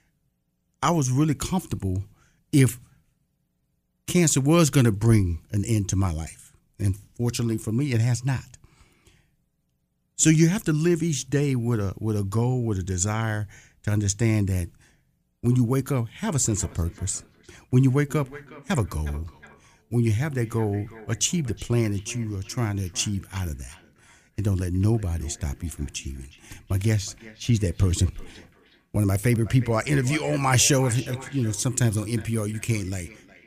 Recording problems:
echo of what is said; faint; from 16 s on; 360 ms later, 20 dB below the speech

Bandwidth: 15 kHz